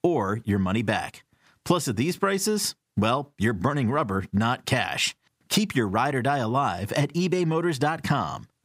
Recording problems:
squashed, flat; somewhat

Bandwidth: 15.5 kHz